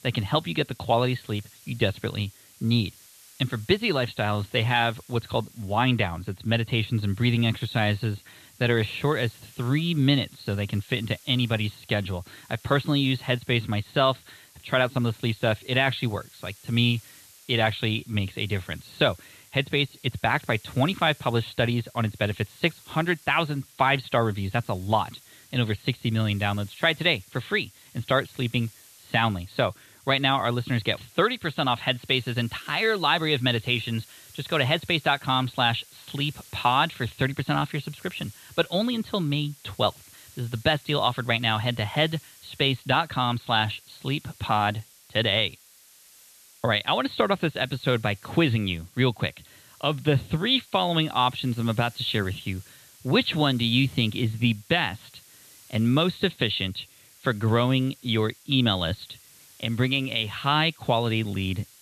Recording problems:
high frequencies cut off; severe; nothing above 4.5 kHz
hiss; faint; throughout; 25 dB below the speech

